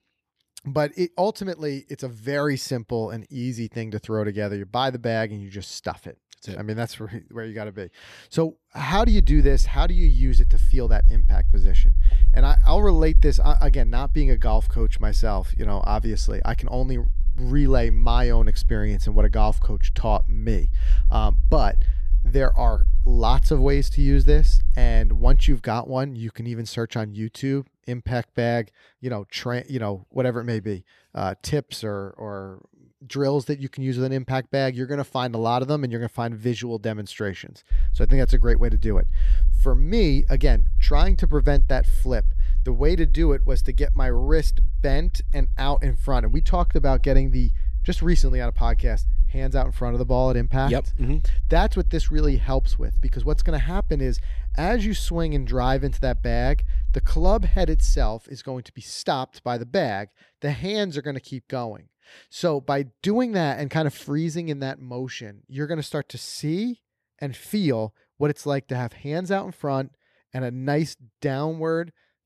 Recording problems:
low rumble; faint; from 9 to 26 s and from 38 to 58 s; 20 dB below the speech

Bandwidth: 13.5 kHz